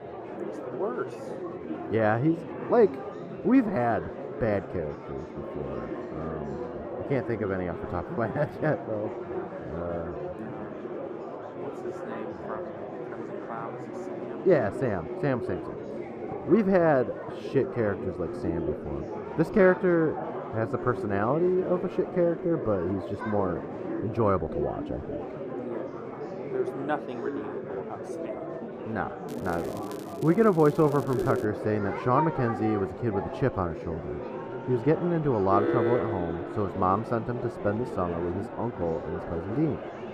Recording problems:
muffled; very; fading above 2 kHz
murmuring crowd; loud; throughout; 8 dB below the speech
crackling; faint; from 29 to 31 s; 25 dB below the speech
alarm; loud; from 35 to 37 s; peak 2 dB above the speech

